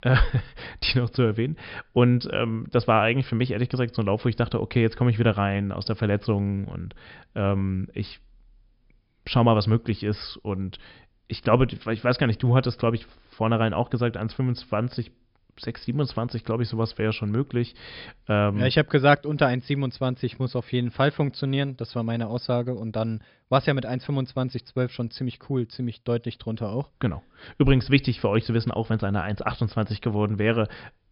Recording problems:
high frequencies cut off; noticeable; nothing above 5.5 kHz

